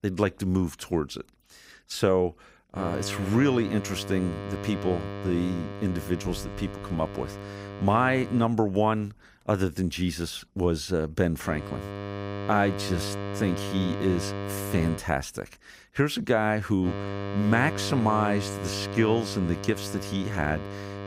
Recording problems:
electrical hum; loud; from 3 to 8.5 s, from 11 to 15 s and from 17 s on; 50 Hz, 8 dB below the speech

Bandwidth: 15.5 kHz